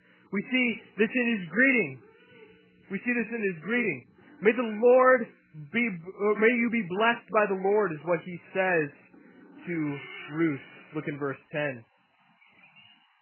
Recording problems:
garbled, watery; badly; nothing above 3 kHz
animal sounds; faint; throughout; 20 dB below the speech

